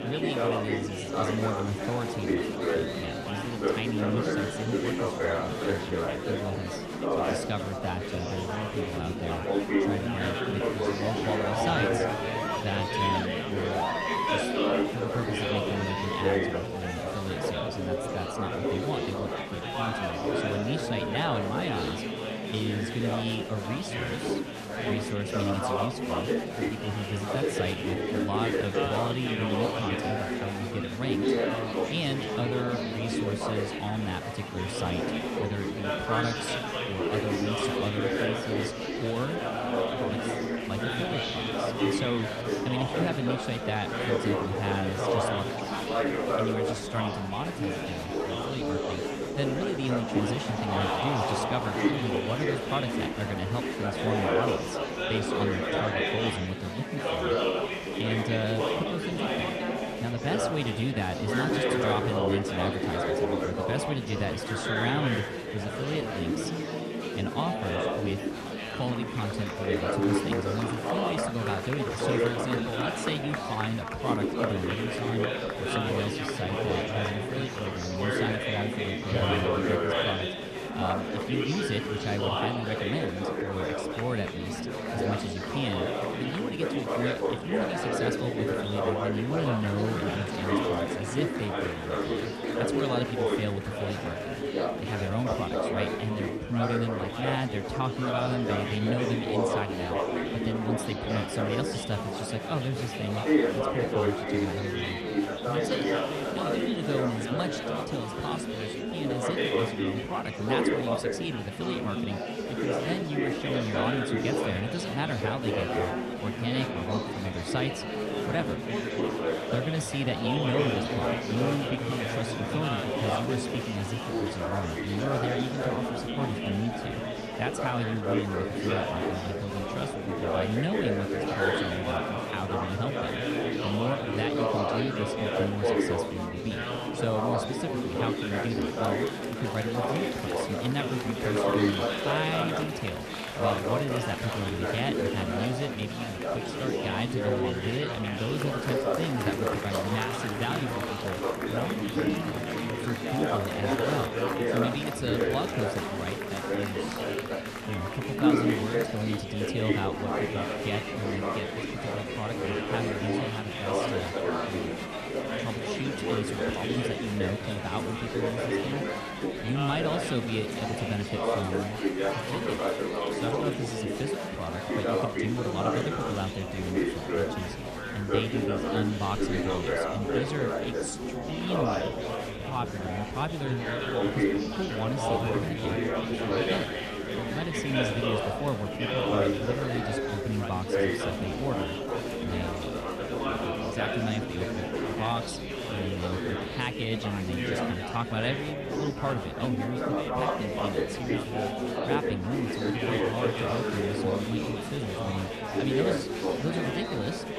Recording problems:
murmuring crowd; very loud; throughout; 4 dB above the speech

